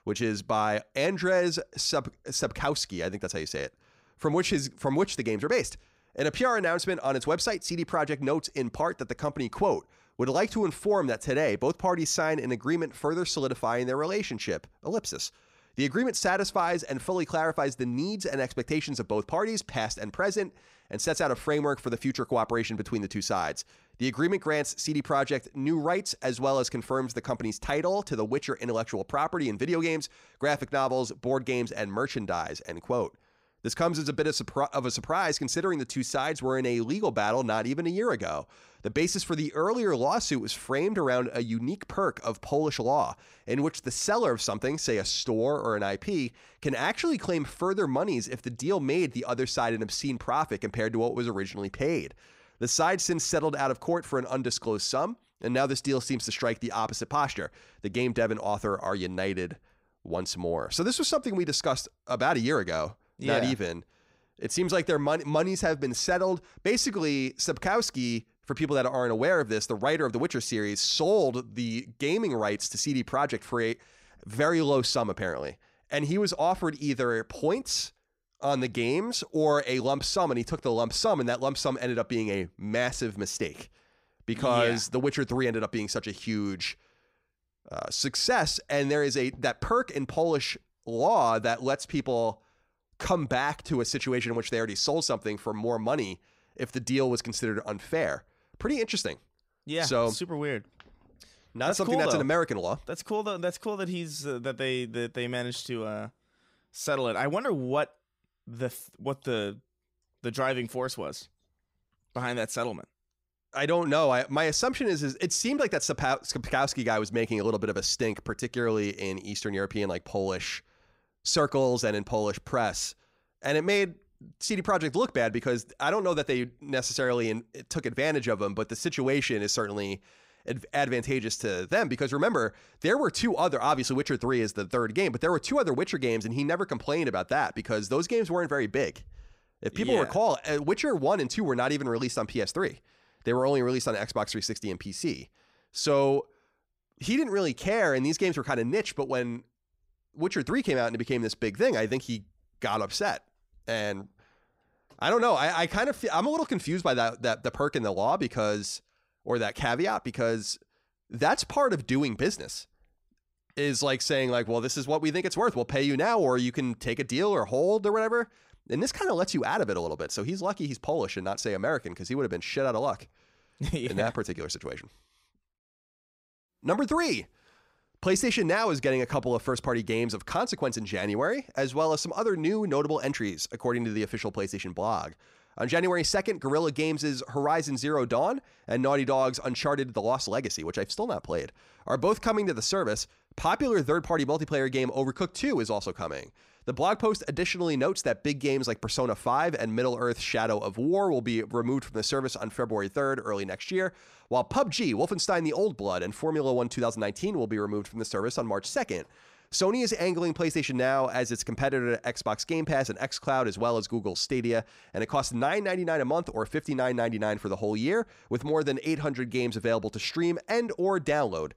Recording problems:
none

